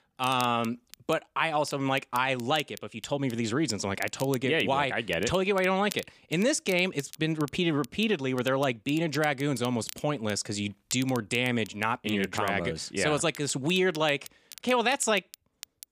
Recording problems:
crackle, like an old record; noticeable; 20 dB below the speech

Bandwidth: 15 kHz